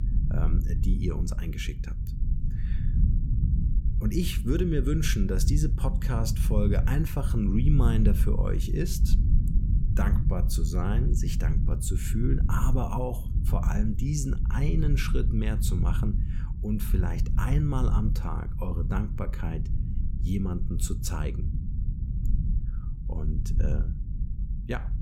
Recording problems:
low rumble; loud; throughout; 8 dB below the speech

